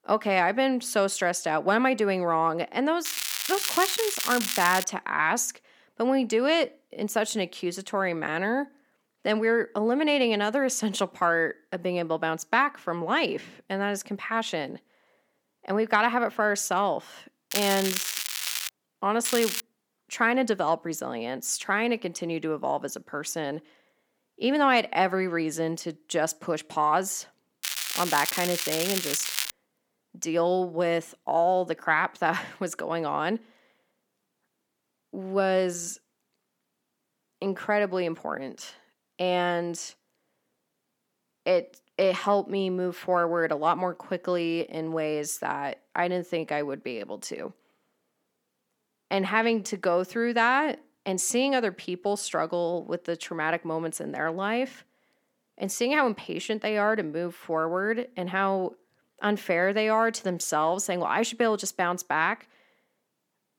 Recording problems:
crackling; loud; 4 times, first at 3 s; 2 dB below the speech

